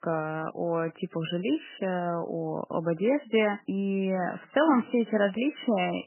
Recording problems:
garbled, watery; badly; nothing above 3 kHz

